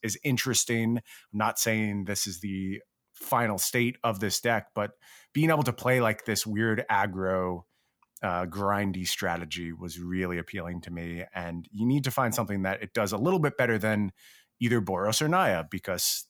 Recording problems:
none

